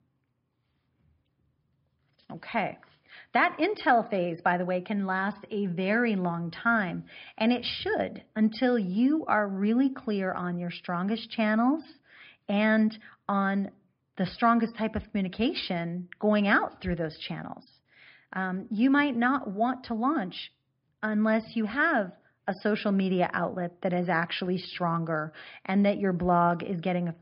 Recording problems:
high frequencies cut off; noticeable; nothing above 5.5 kHz

